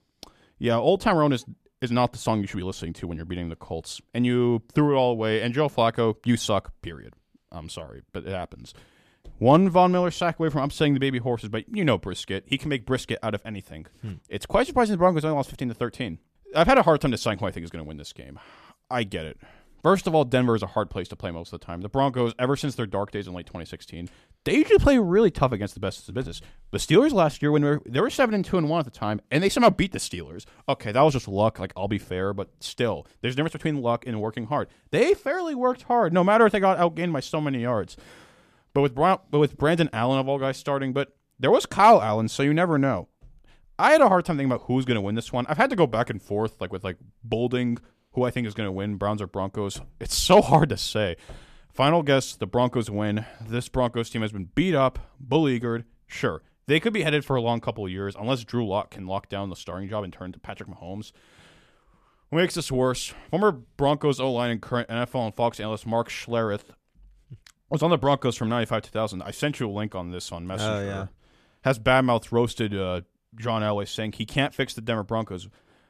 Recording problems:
none

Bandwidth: 14.5 kHz